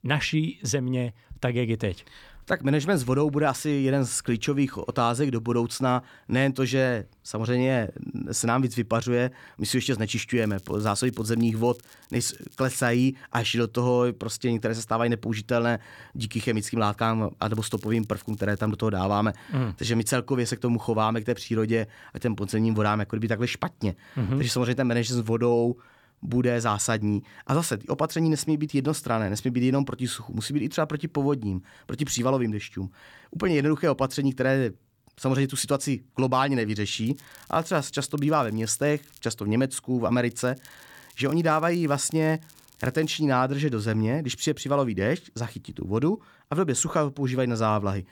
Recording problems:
crackling; faint; 4 times, first at 10 s; 25 dB below the speech

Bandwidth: 18 kHz